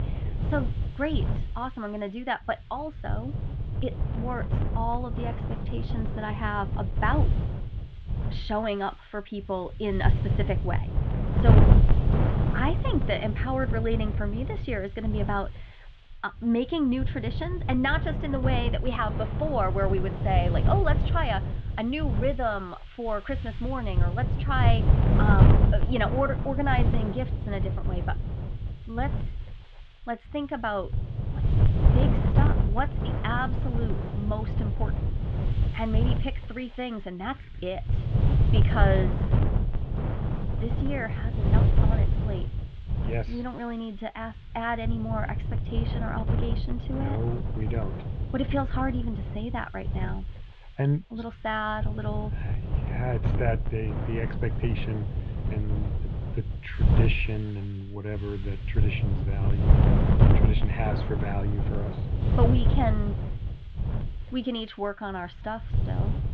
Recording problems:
muffled; very; fading above 3.5 kHz
wind noise on the microphone; heavy; 6 dB below the speech

